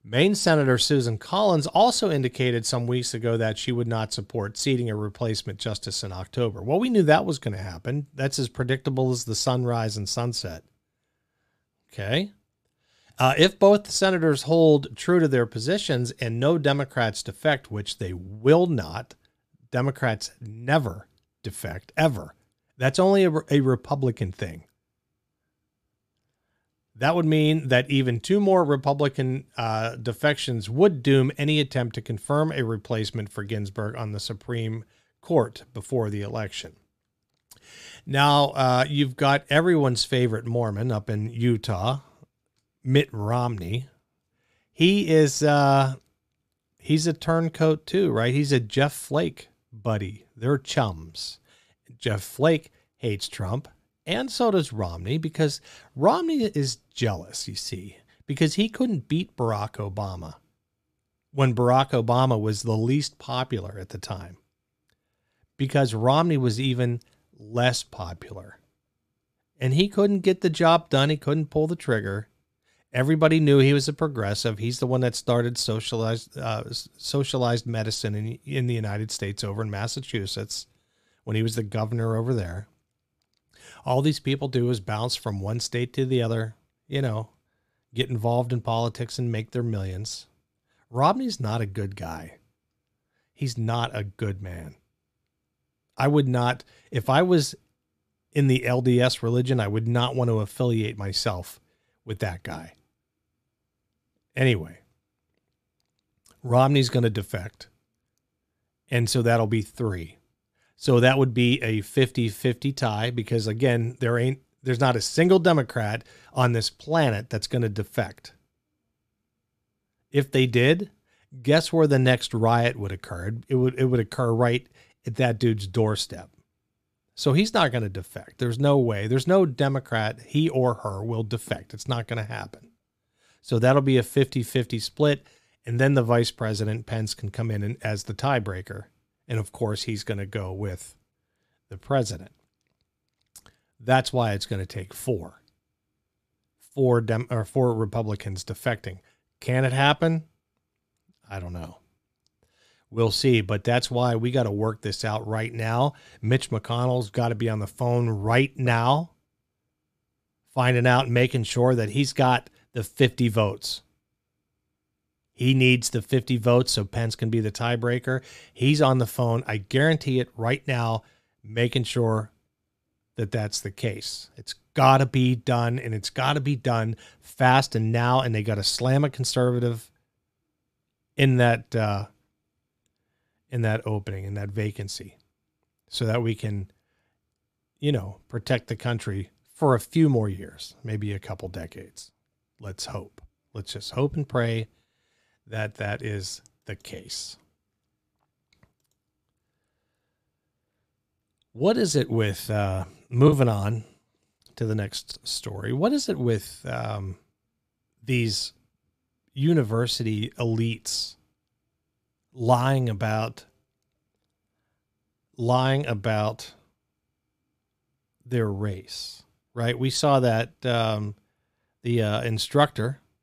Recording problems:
choppy; occasionally; from 3:23 to 3:25; 4% of the speech affected

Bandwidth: 14.5 kHz